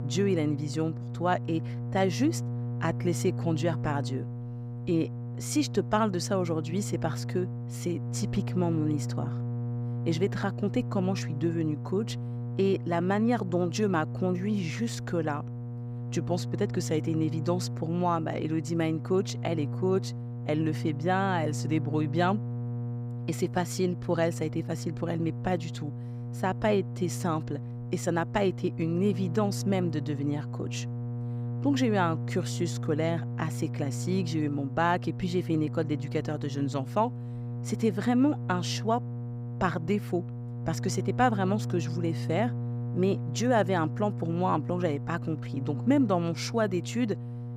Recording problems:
electrical hum; noticeable; throughout; 60 Hz, 15 dB below the speech

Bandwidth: 15.5 kHz